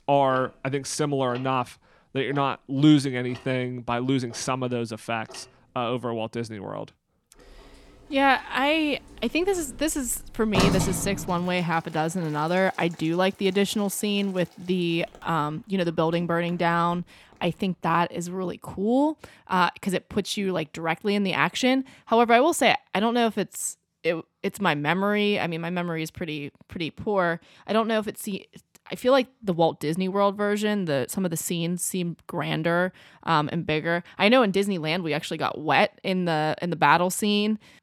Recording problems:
household noises; loud; until 18 s; 9 dB below the speech

